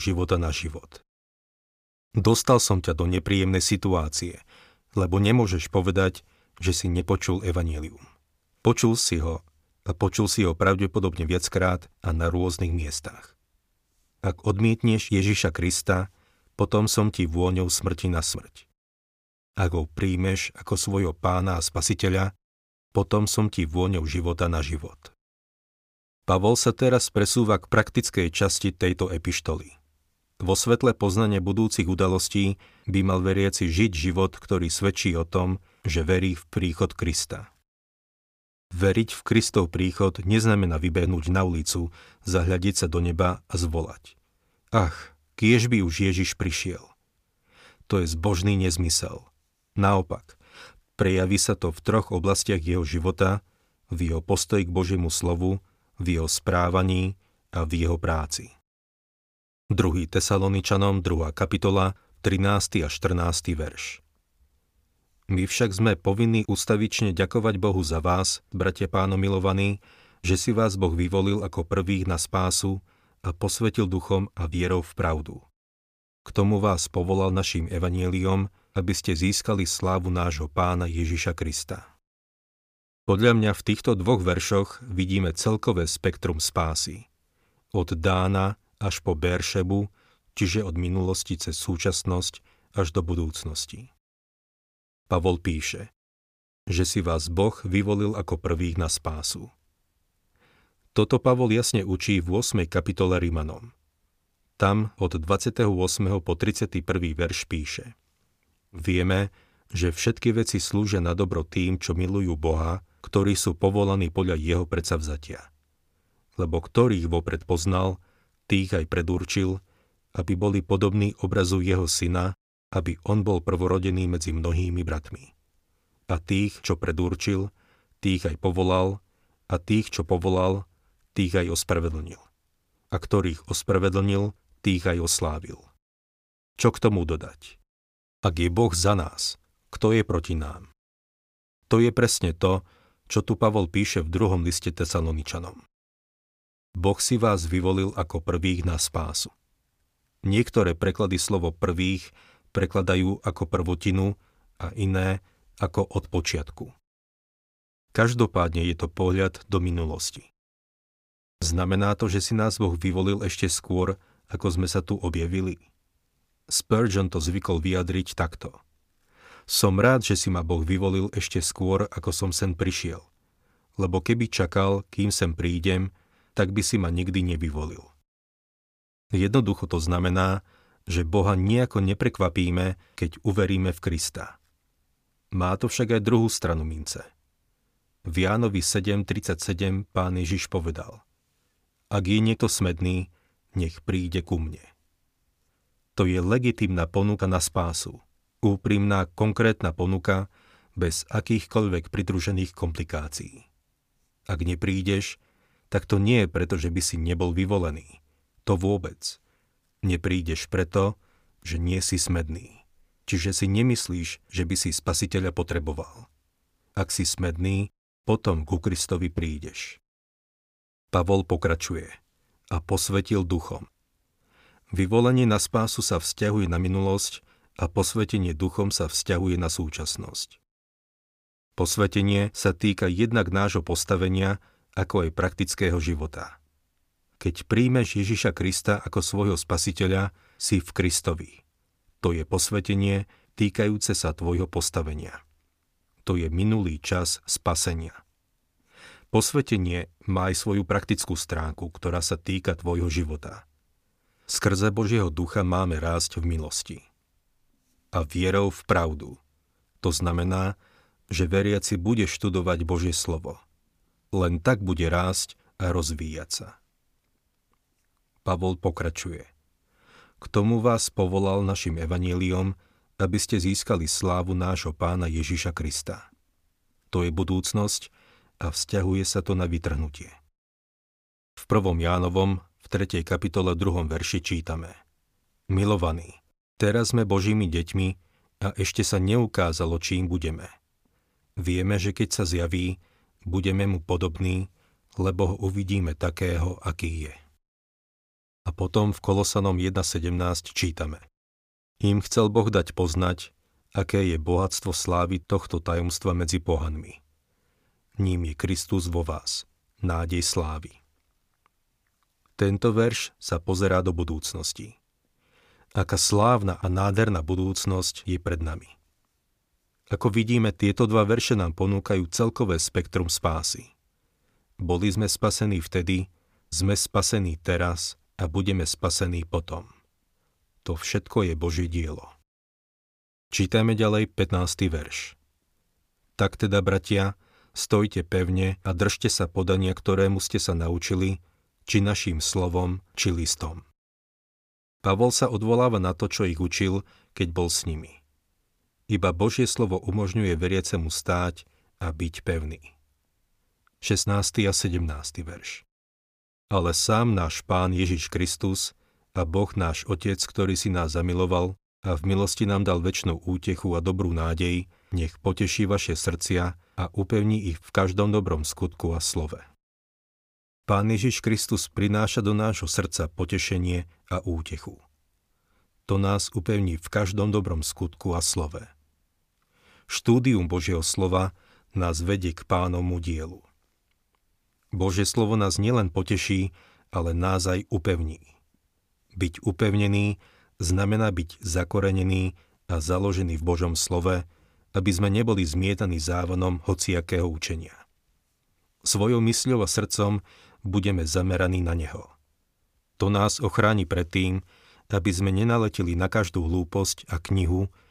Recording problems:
abrupt cut into speech; at the start

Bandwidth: 15 kHz